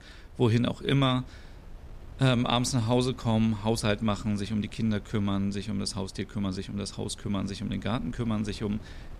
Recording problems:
wind noise on the microphone; occasional gusts; 25 dB below the speech

